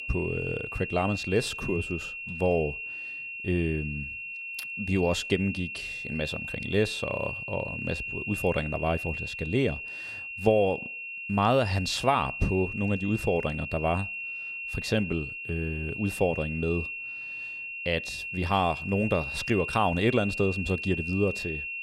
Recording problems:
high-pitched whine; loud; throughout; 2.5 kHz, 5 dB below the speech

